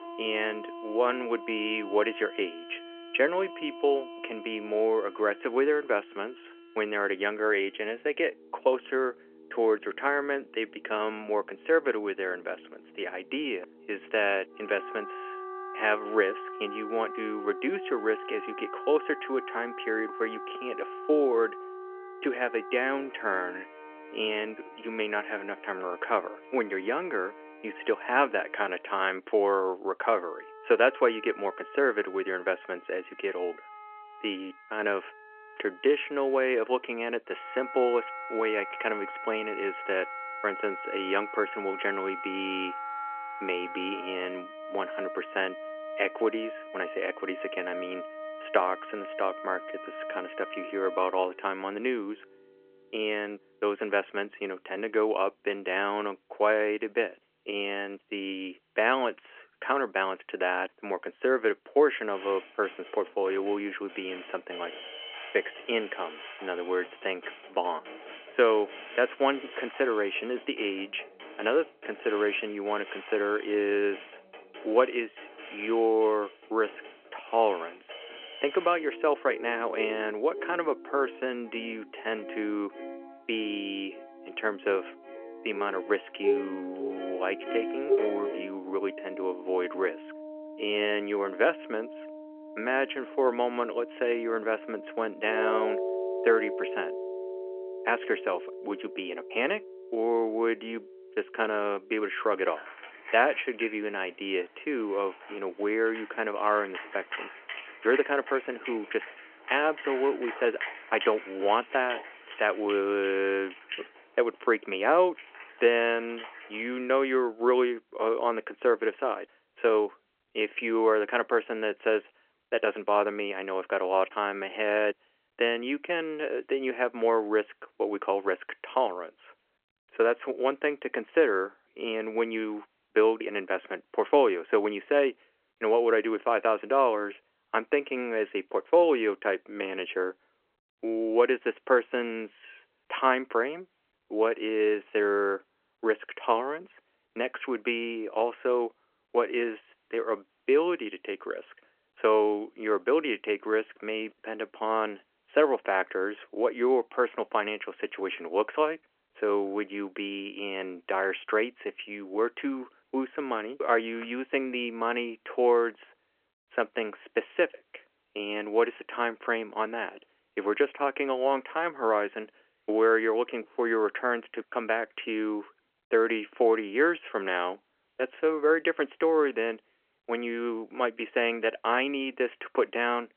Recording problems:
phone-call audio
background music; noticeable; until 1:57; 10 dB below the speech

